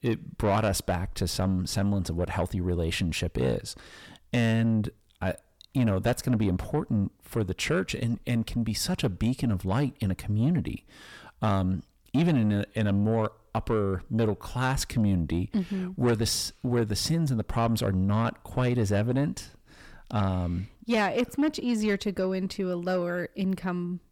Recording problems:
distortion; slight; 10 dB below the speech

